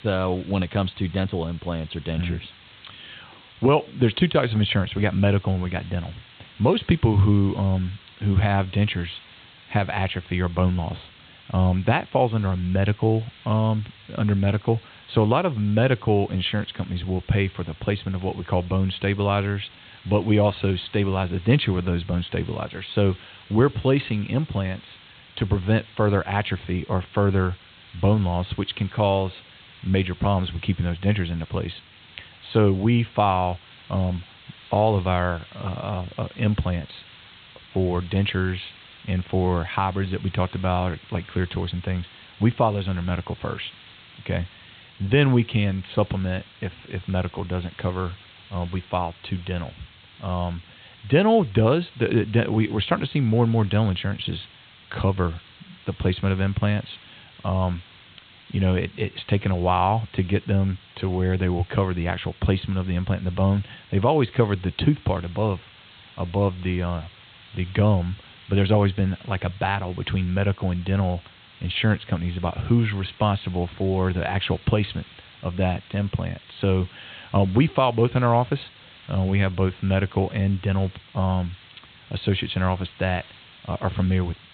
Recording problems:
high frequencies cut off; severe; nothing above 4 kHz
hiss; faint; throughout; 25 dB below the speech

